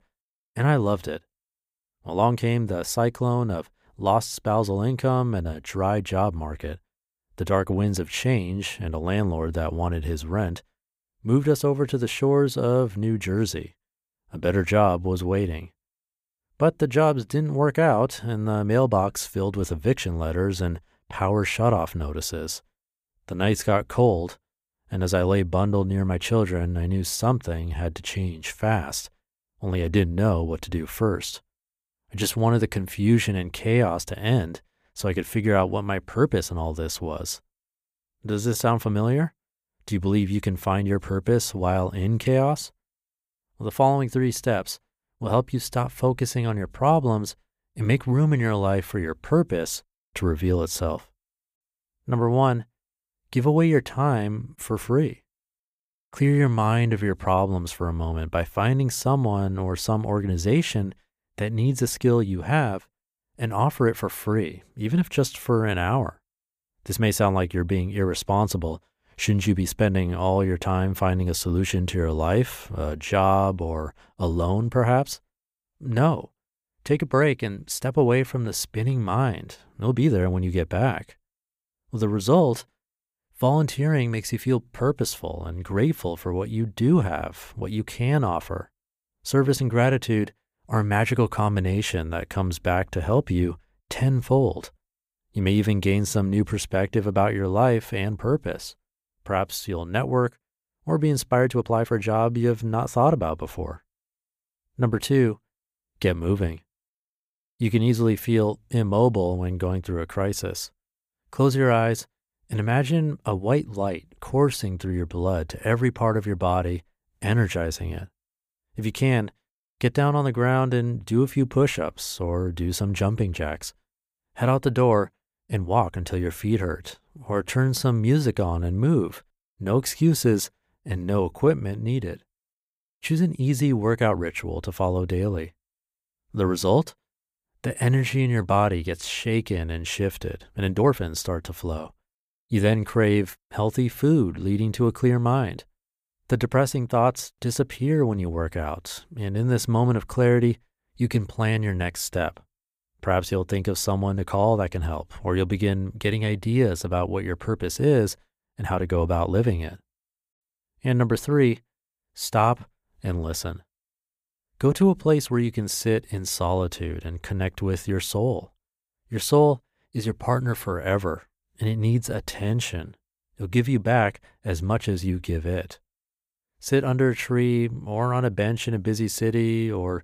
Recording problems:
uneven, jittery; strongly; from 2 s to 2:53

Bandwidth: 15 kHz